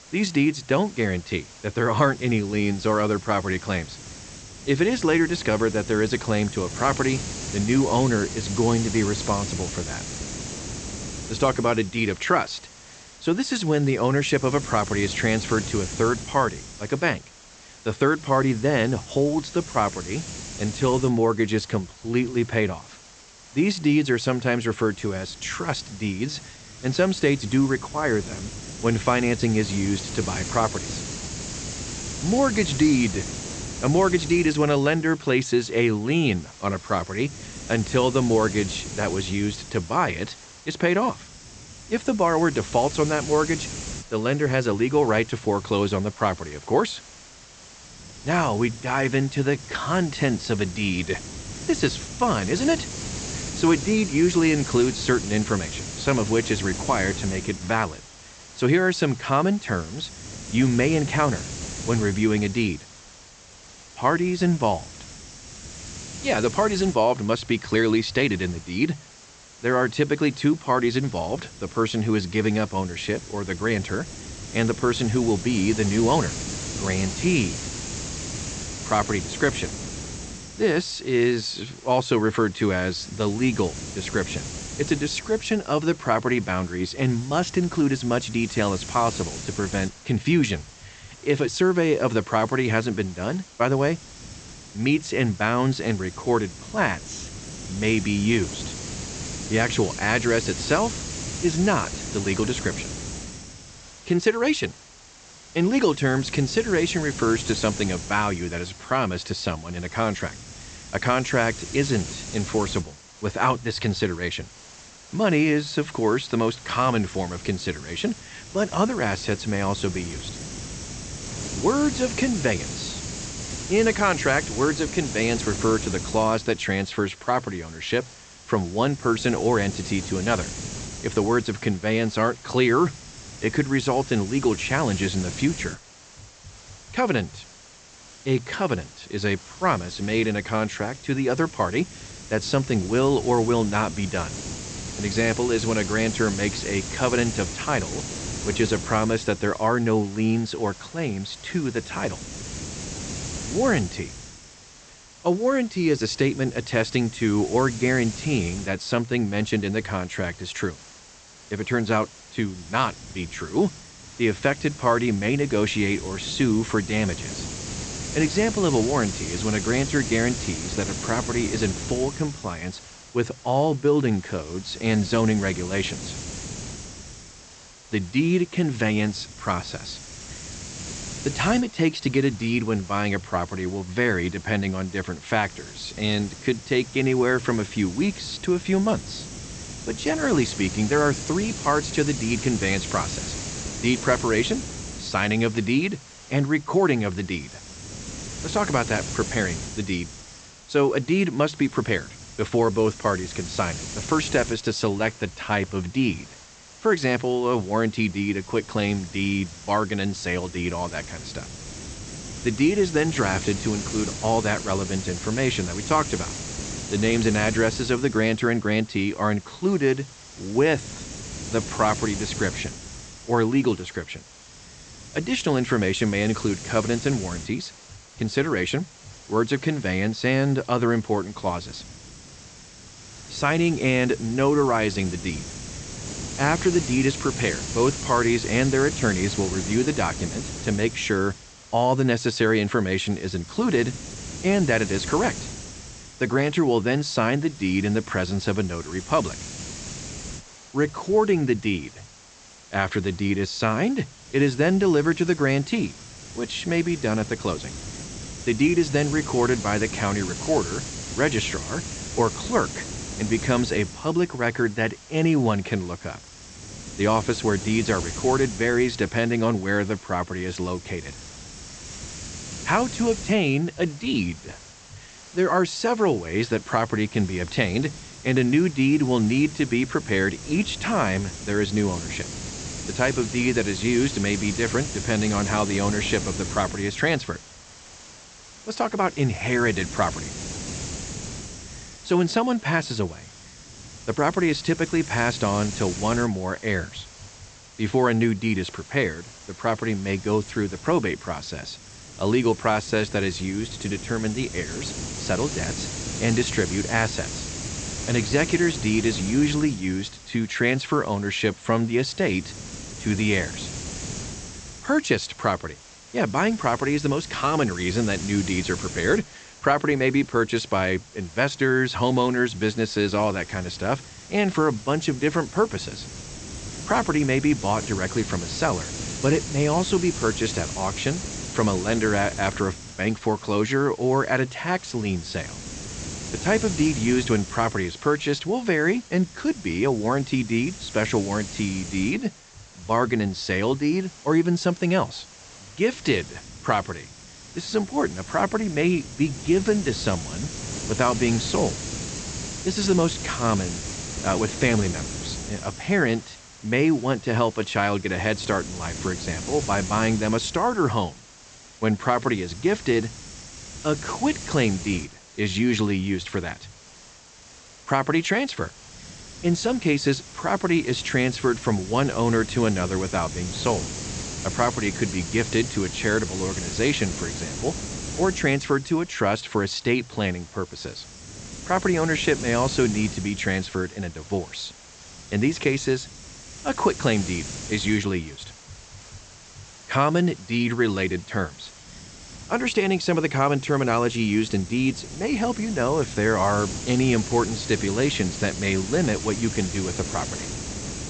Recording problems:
high frequencies cut off; noticeable; nothing above 8 kHz
hiss; noticeable; throughout; 10 dB below the speech

